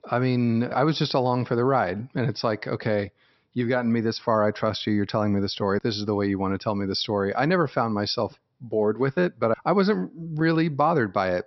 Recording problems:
high frequencies cut off; noticeable; nothing above 5.5 kHz

